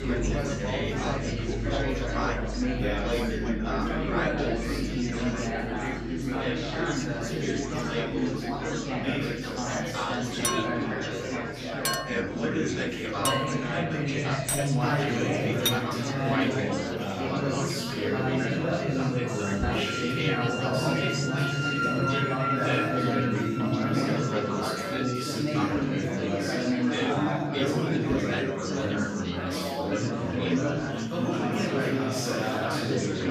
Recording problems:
off-mic speech; far
room echo; noticeable; dies away in 1.1 s
chatter from many people; very loud; throughout; 4 dB above the speech
background music; loud; throughout; 3 dB below the speech
clattering dishes; loud; from 10 to 16 s; peak 5 dB above the speech

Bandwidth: 14.5 kHz